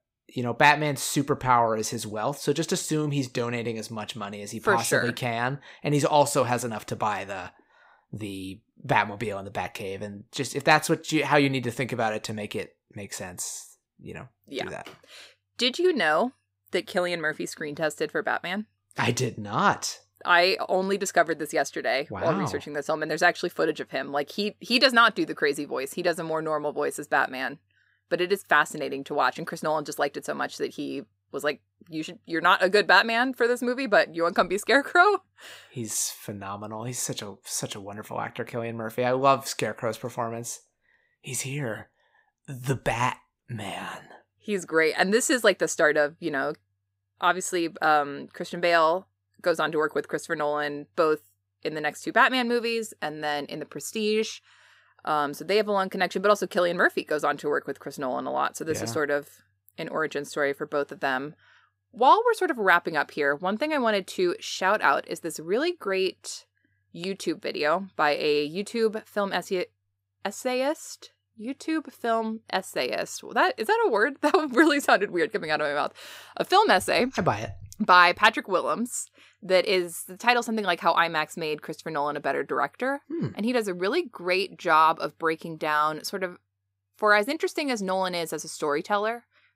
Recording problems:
none

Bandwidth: 15.5 kHz